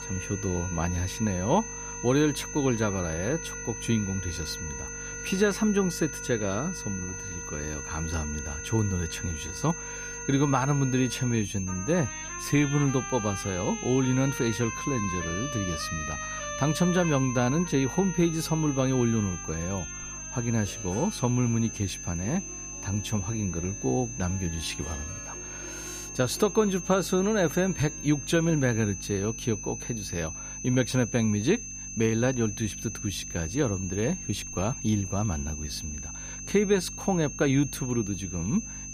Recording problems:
high-pitched whine; loud; throughout; 6 kHz, 8 dB below the speech
background music; noticeable; throughout; 15 dB below the speech
electrical hum; faint; throughout; 50 Hz, 25 dB below the speech

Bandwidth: 14.5 kHz